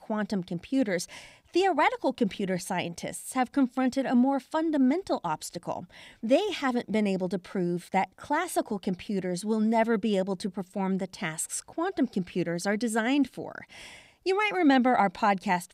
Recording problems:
none

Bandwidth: 15.5 kHz